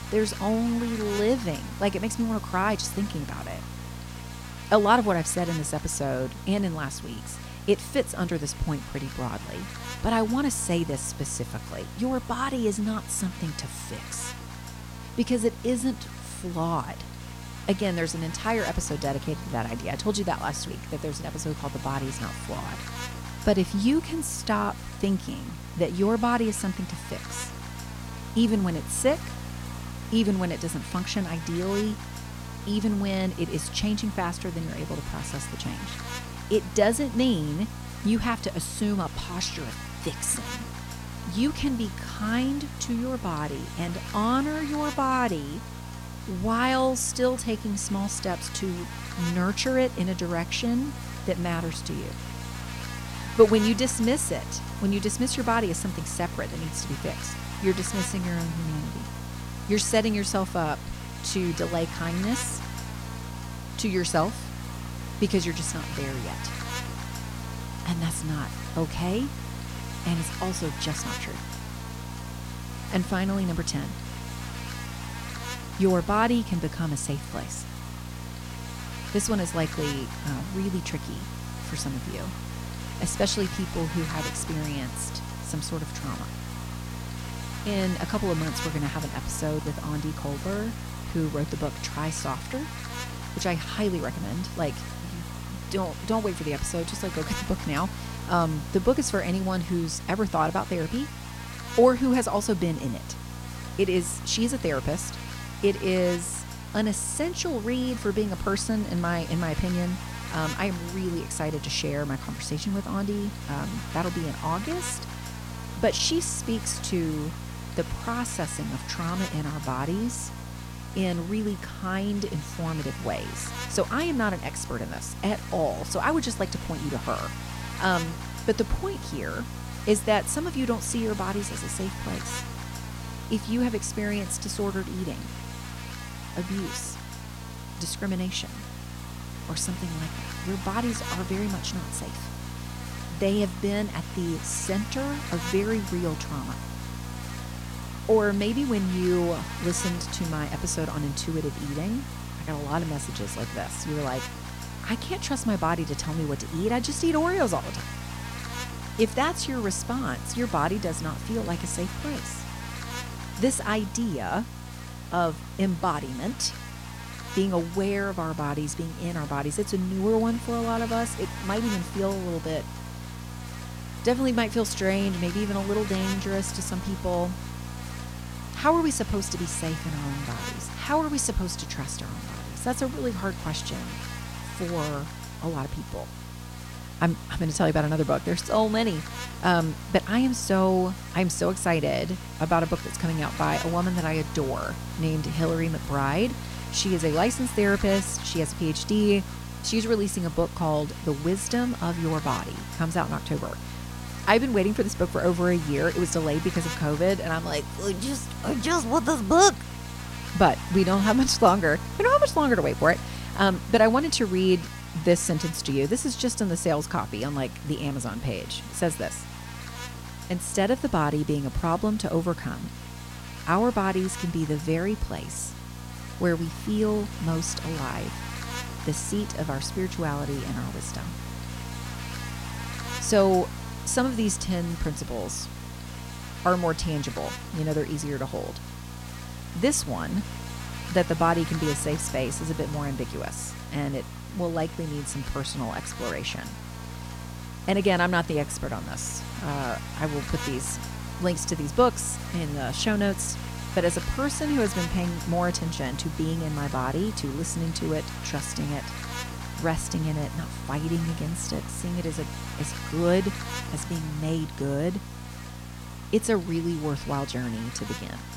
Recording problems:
electrical hum; noticeable; throughout; 60 Hz, 10 dB below the speech
hiss; faint; throughout; 25 dB below the speech

